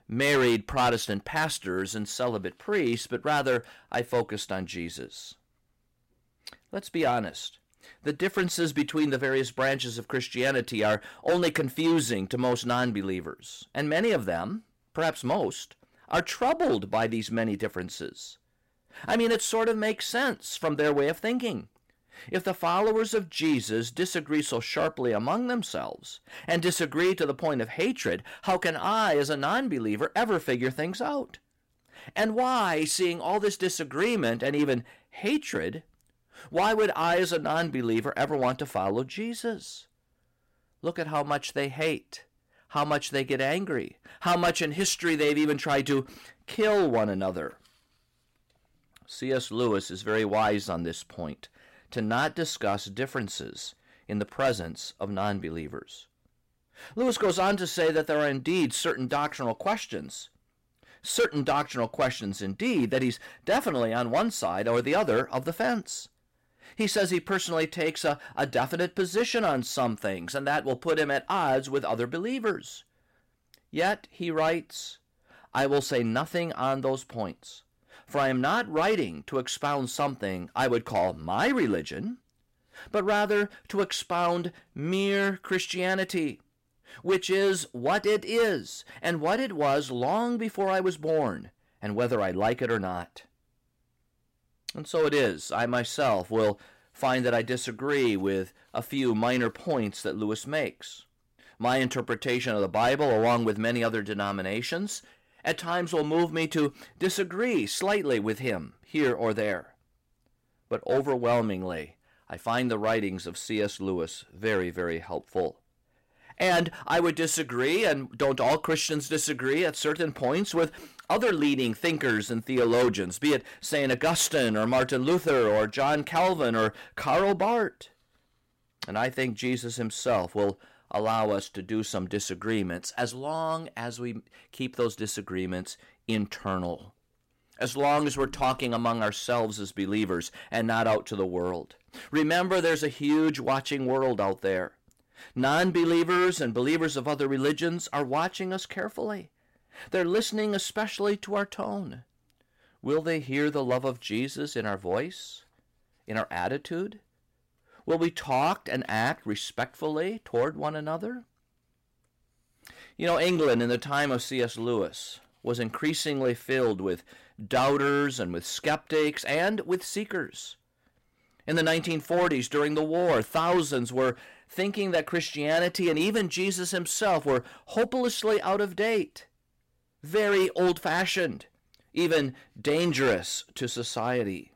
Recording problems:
distortion; slight; 5% of the sound clipped

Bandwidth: 16 kHz